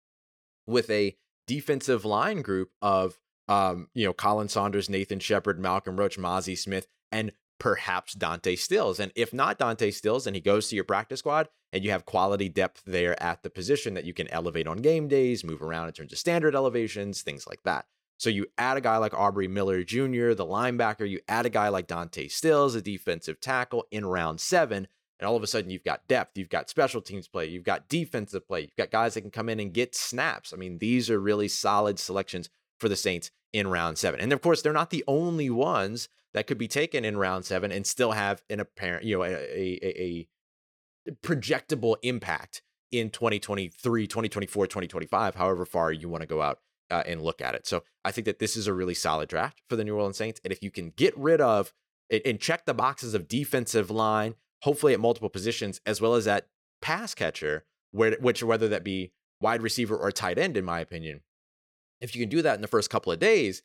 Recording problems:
none

